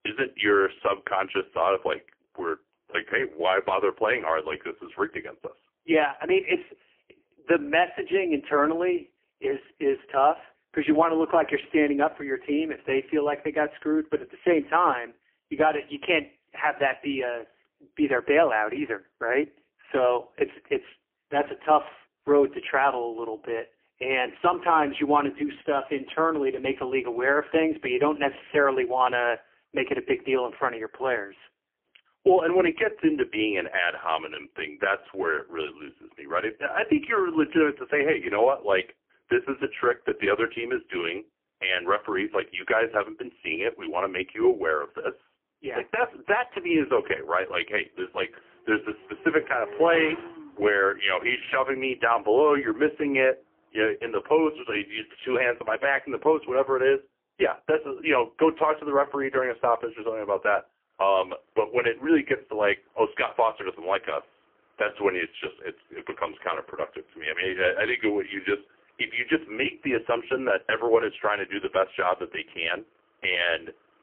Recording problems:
phone-call audio; poor line; nothing above 3 kHz
traffic noise; noticeable; throughout; 20 dB below the speech

